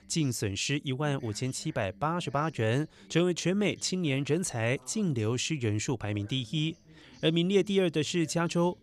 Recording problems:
voice in the background; faint; throughout; 25 dB below the speech

